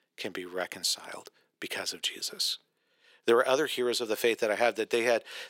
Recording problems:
thin; very; fading below 400 Hz

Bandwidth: 16 kHz